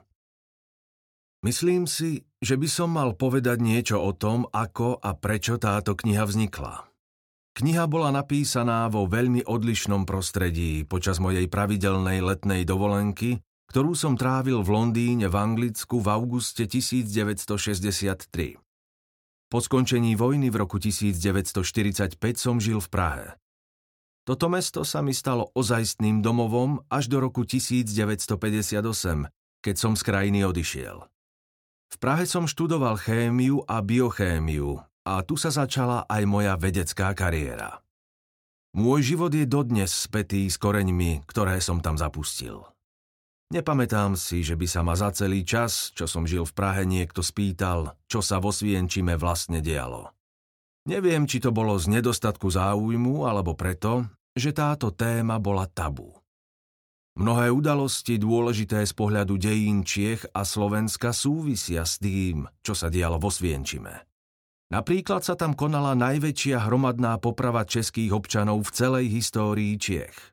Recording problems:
none

